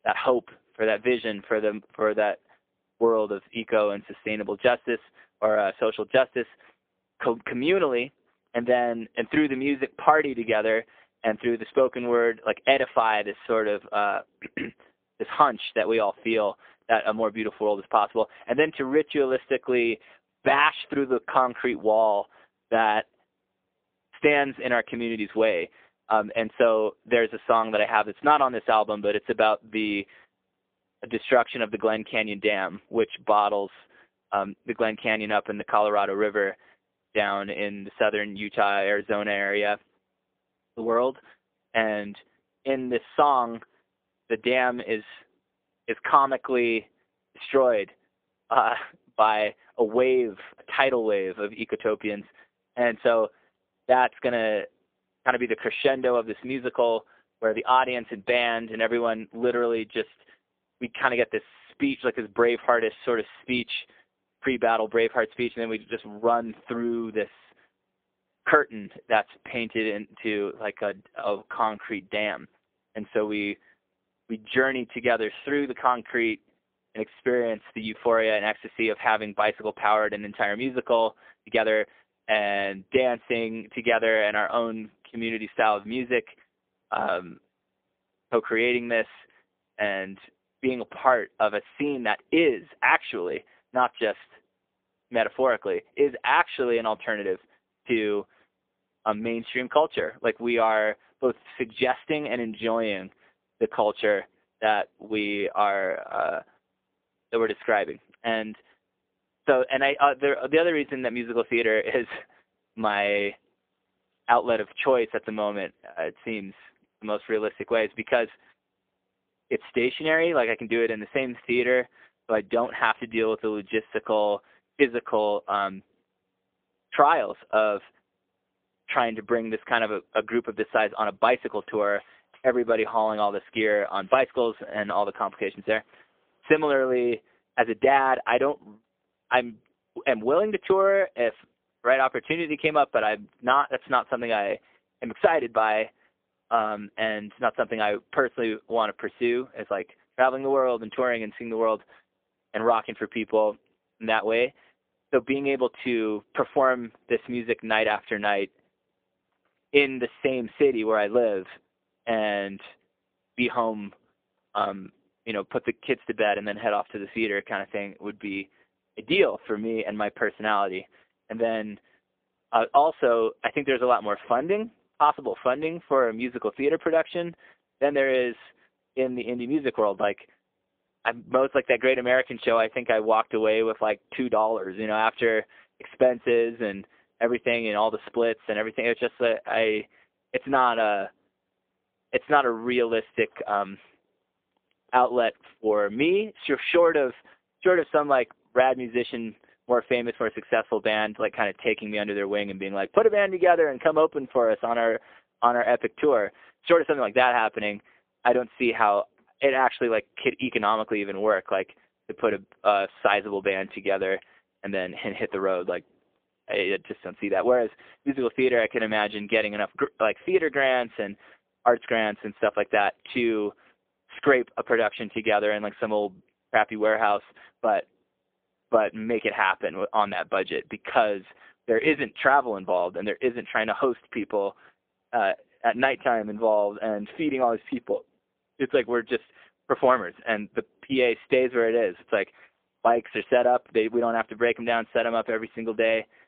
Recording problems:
phone-call audio; poor line; nothing above 3.5 kHz
uneven, jittery; strongly; from 1:11 to 3:27

